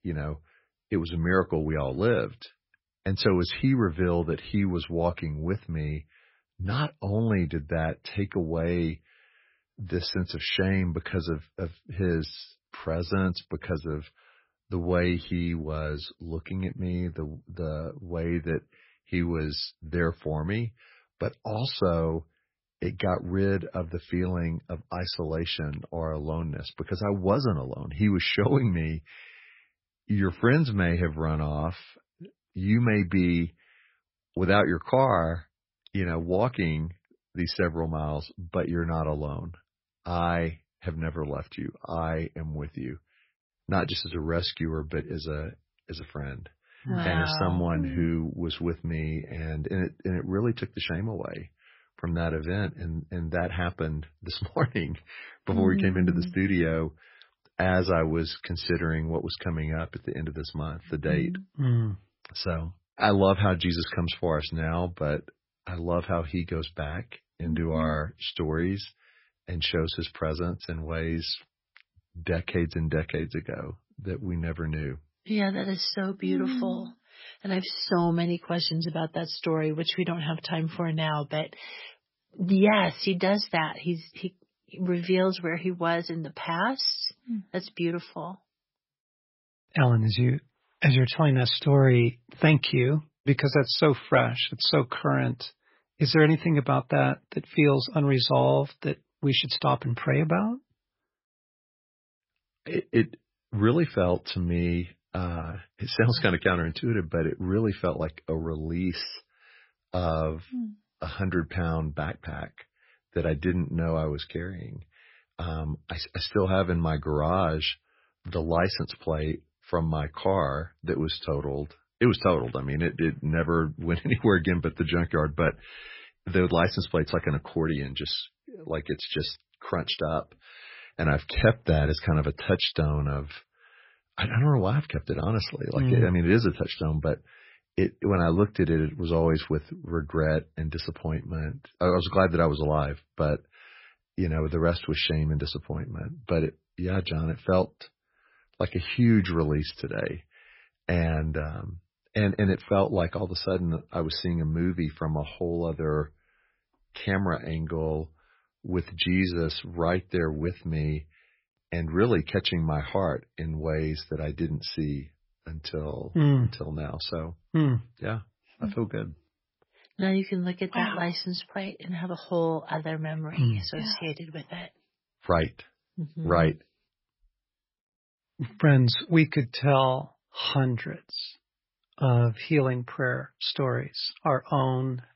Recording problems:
garbled, watery; badly; nothing above 5.5 kHz

